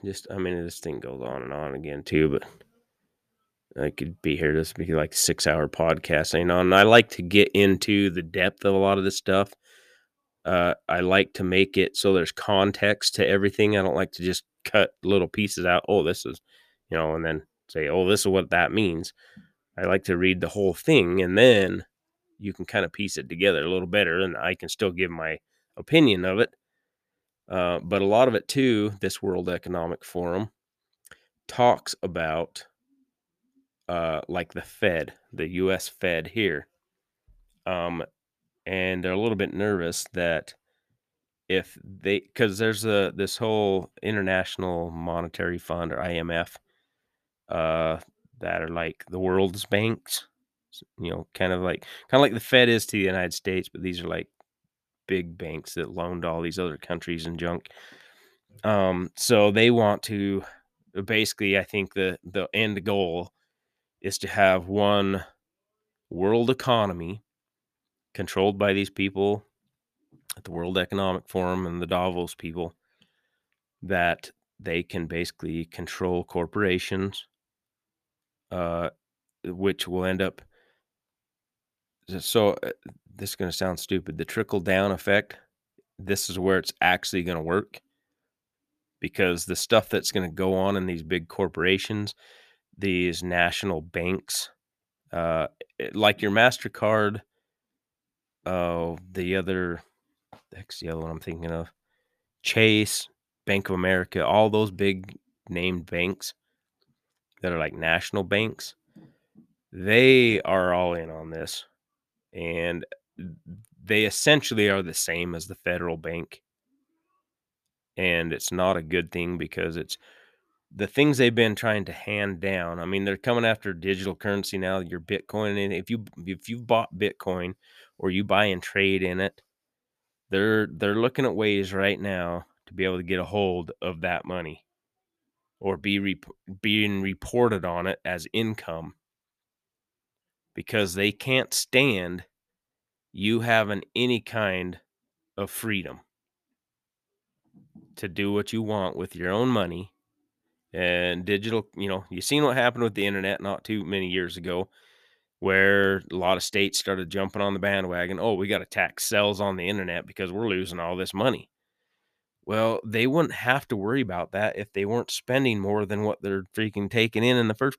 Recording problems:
none

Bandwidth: 14.5 kHz